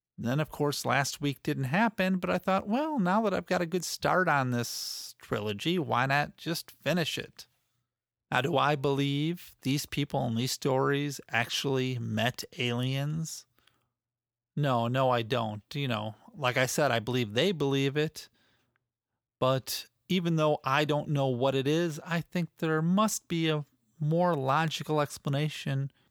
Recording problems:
none

